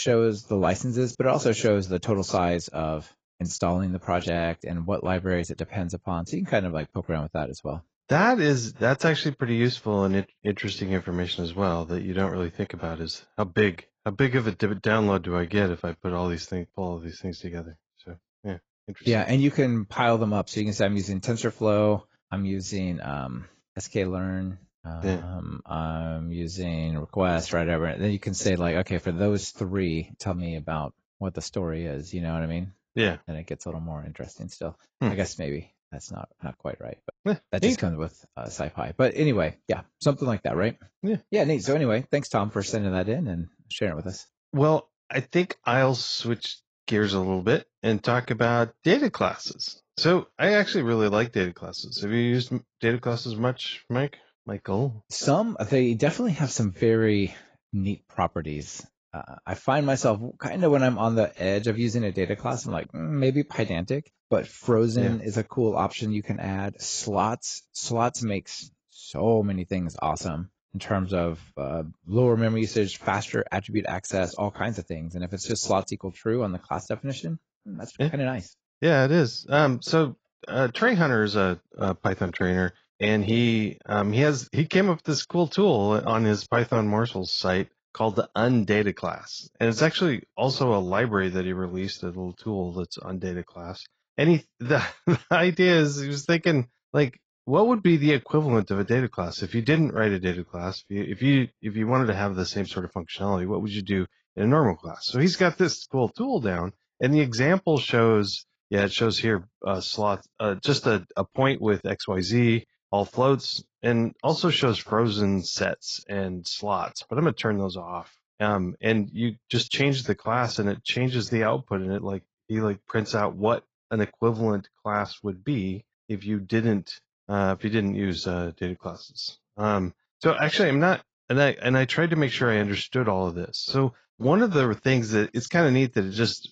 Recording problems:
garbled, watery; badly; nothing above 7.5 kHz
abrupt cut into speech; at the start

